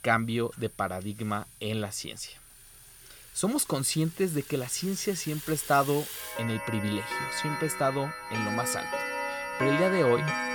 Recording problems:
household noises; loud; throughout; 4 dB below the speech
high-pitched whine; noticeable; throughout; 9.5 kHz, 20 dB below the speech

